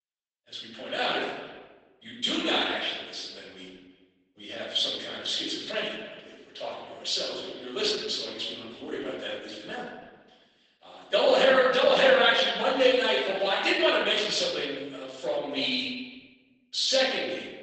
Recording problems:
off-mic speech; far
garbled, watery; badly; nothing above 8 kHz
room echo; noticeable; dies away in 1.1 s
thin; somewhat; fading below 450 Hz
echo of what is said; faint; throughout; 340 ms later, 20 dB below the speech

